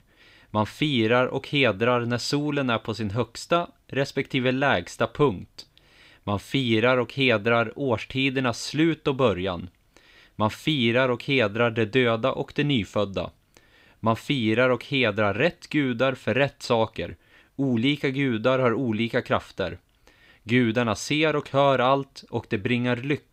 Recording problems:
none

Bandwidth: 15.5 kHz